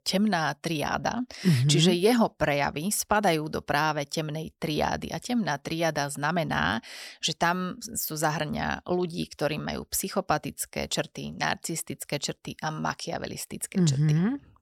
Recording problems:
none

